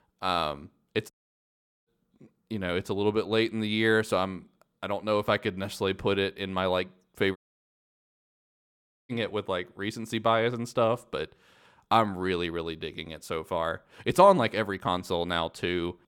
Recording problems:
audio cutting out; at 1 s for 1 s and at 7.5 s for 1.5 s

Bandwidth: 17.5 kHz